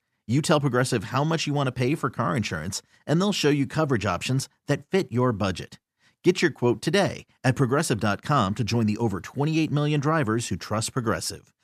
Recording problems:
none

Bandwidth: 14.5 kHz